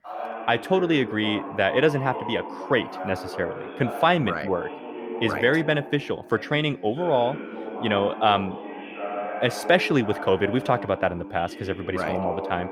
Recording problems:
voice in the background; loud; throughout; 10 dB below the speech

